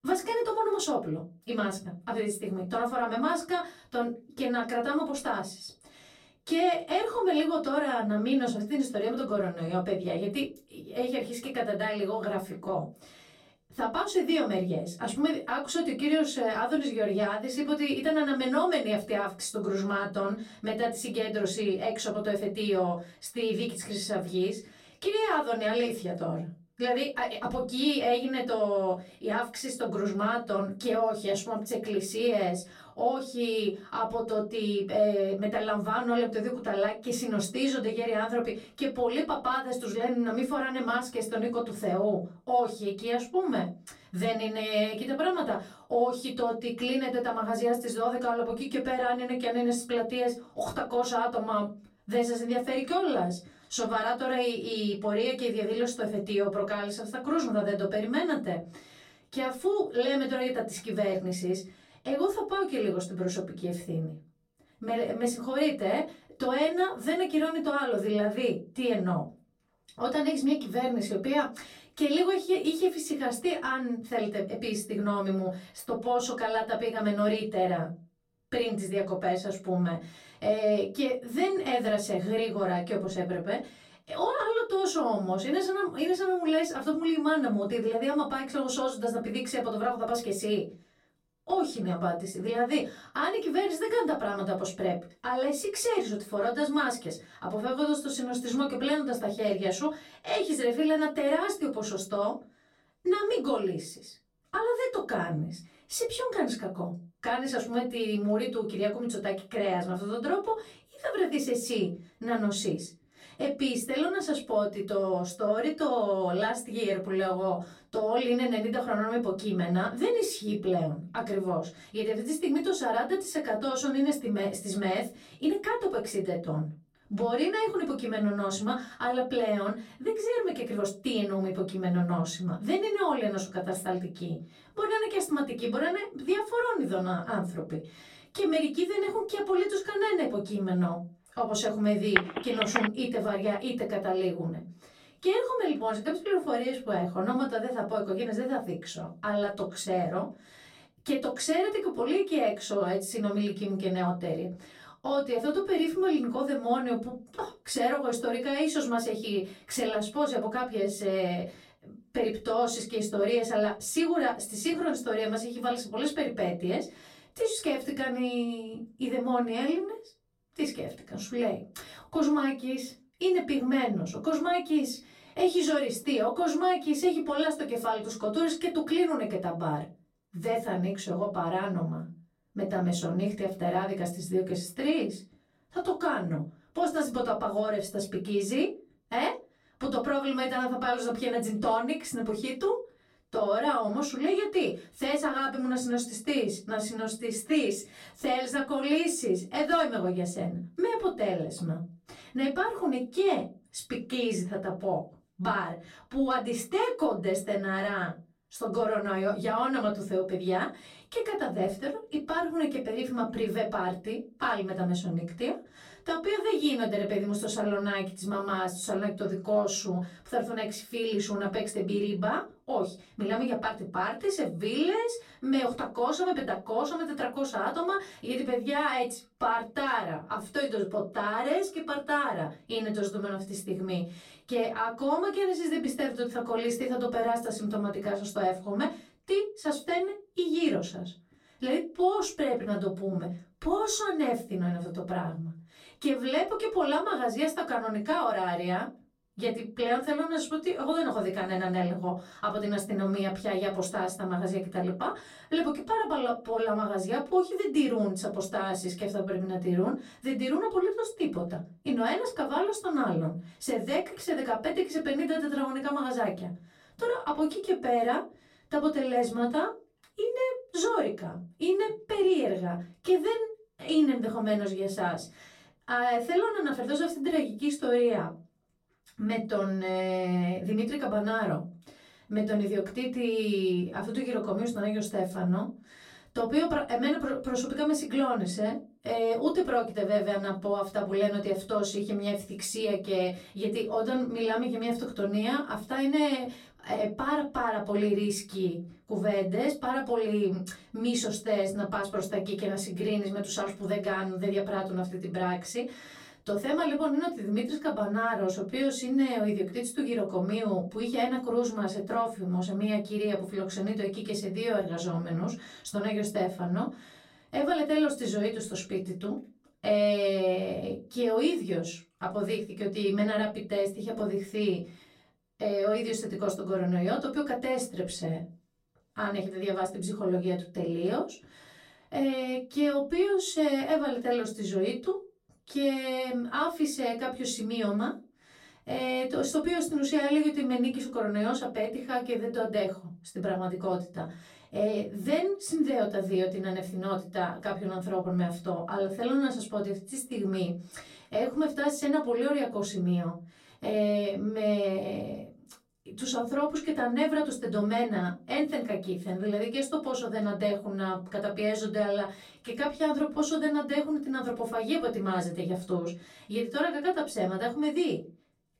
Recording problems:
off-mic speech; far
room echo; very slight; dies away in 0.2 s
phone ringing; loud; at 2:22; peak 2 dB above the speech

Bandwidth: 16 kHz